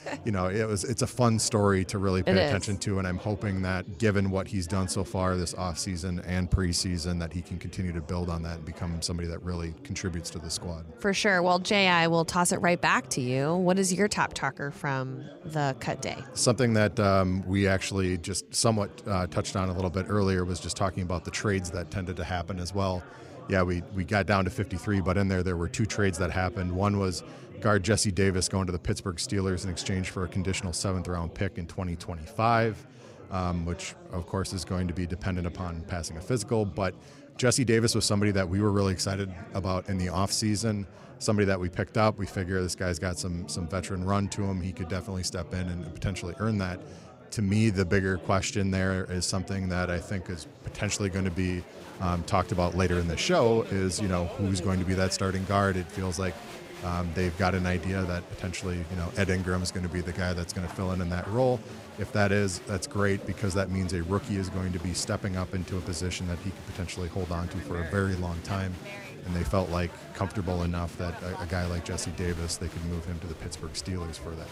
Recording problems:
chatter from many people; noticeable; throughout; 15 dB below the speech

